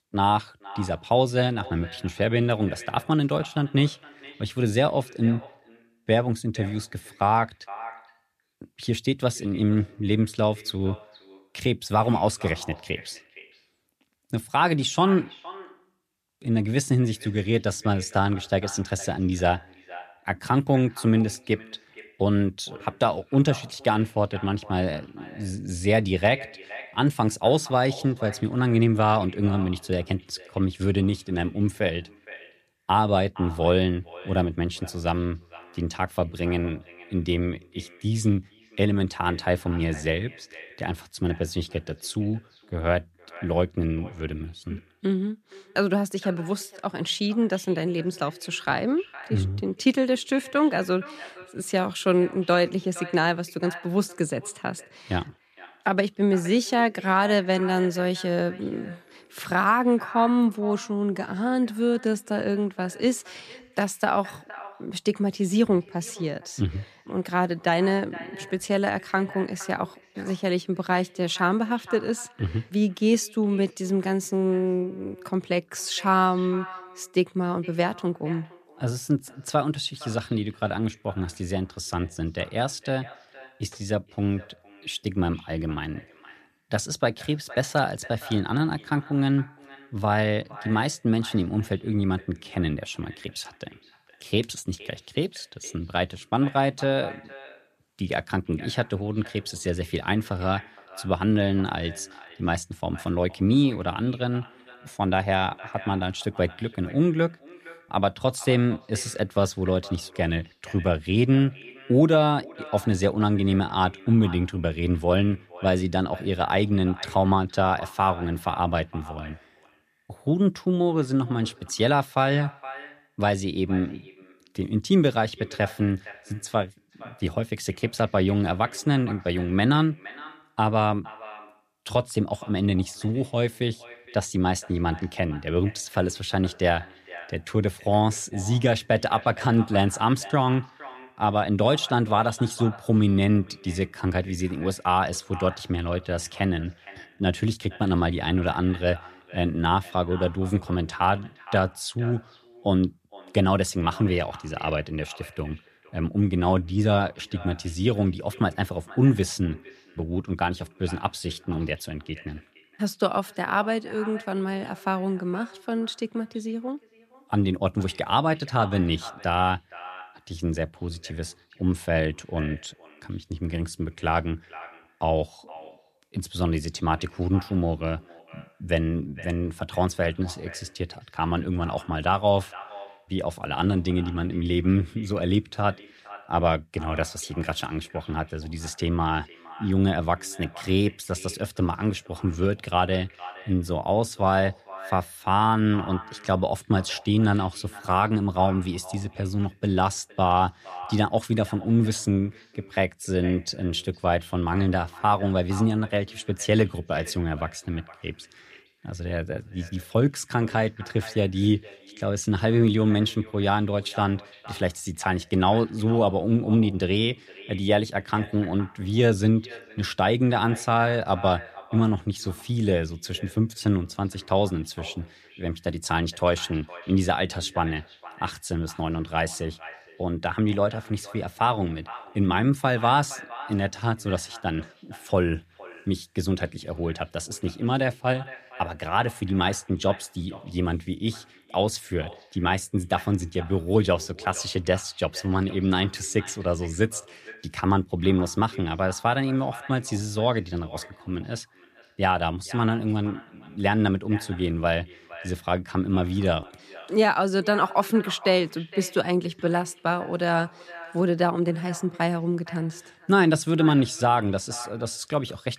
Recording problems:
echo of what is said; faint; throughout; 460 ms later, 20 dB below the speech

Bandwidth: 14.5 kHz